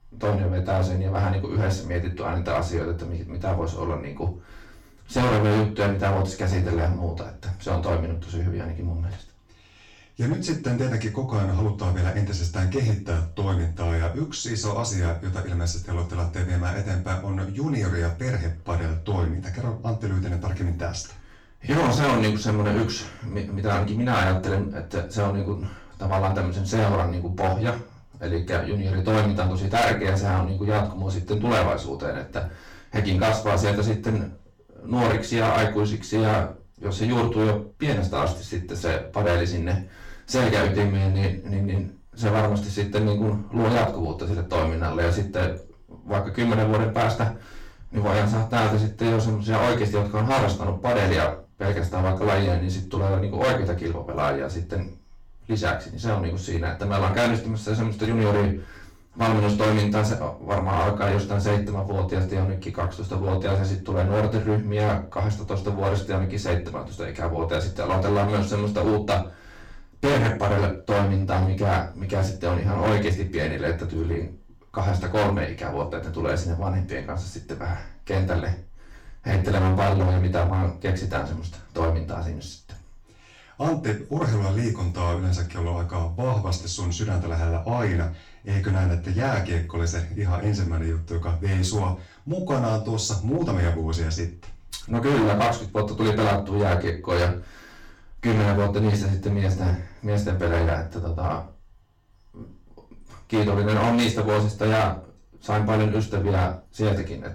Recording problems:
distortion; heavy; 11% of the sound clipped
off-mic speech; far
room echo; slight; dies away in 0.3 s

